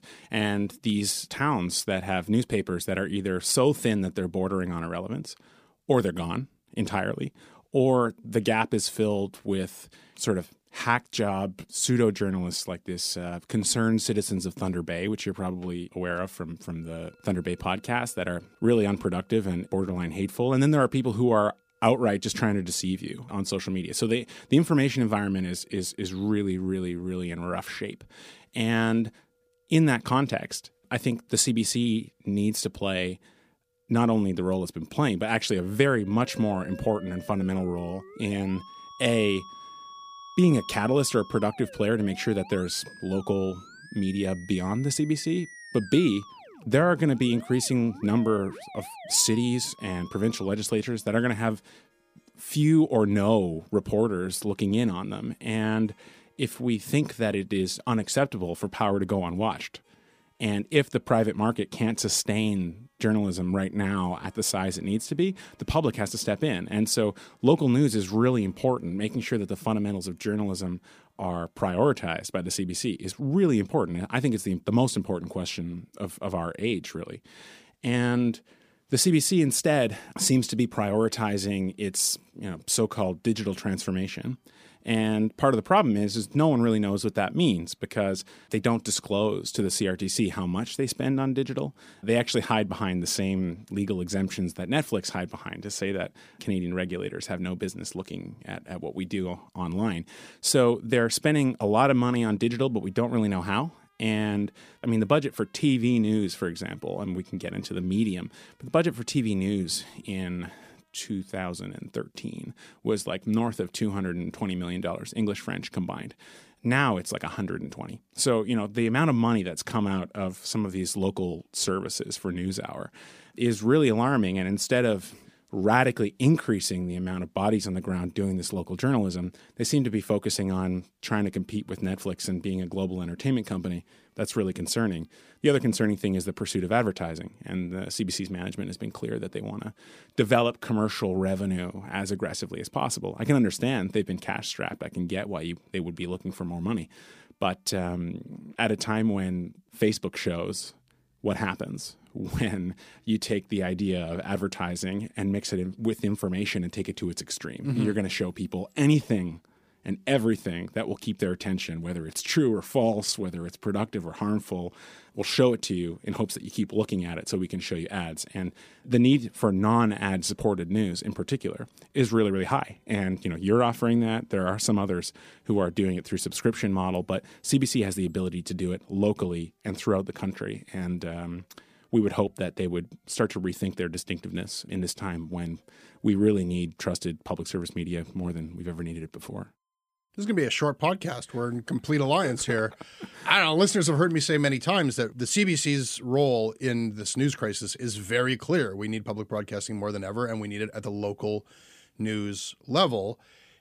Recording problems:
background music; faint; throughout; 20 dB below the speech

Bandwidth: 15 kHz